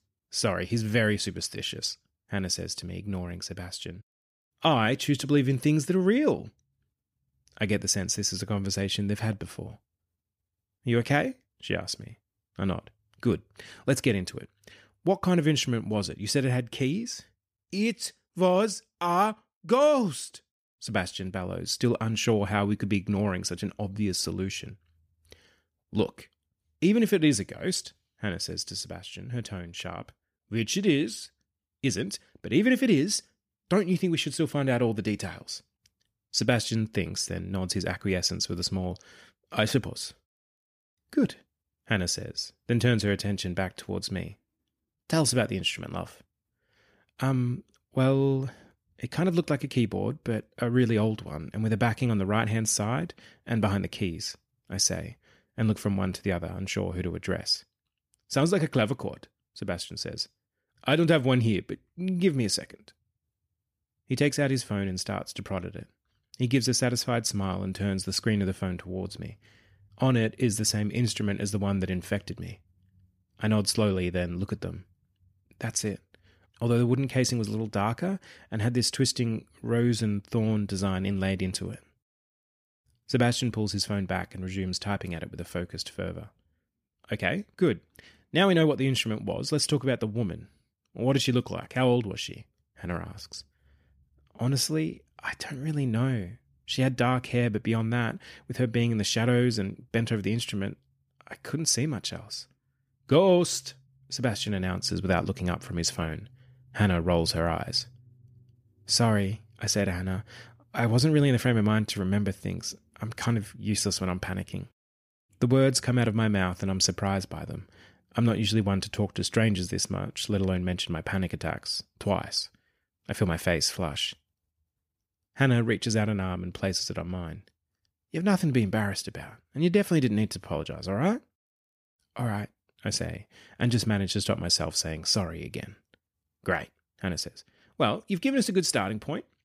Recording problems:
none

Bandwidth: 15 kHz